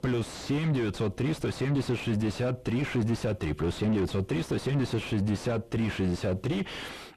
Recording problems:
distortion; heavy; 4 dB below the speech

